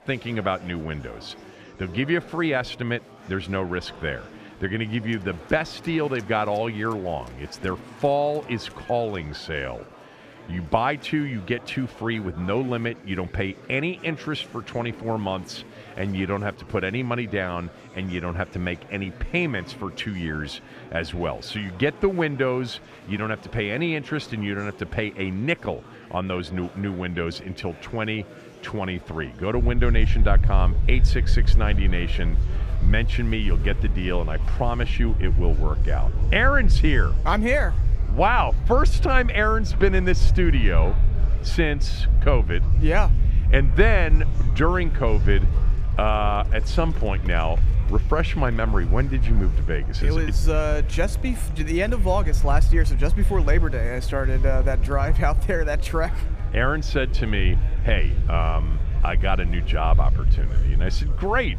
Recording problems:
murmuring crowd; noticeable; throughout; 15 dB below the speech
low rumble; noticeable; from 30 s on; 15 dB below the speech

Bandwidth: 15 kHz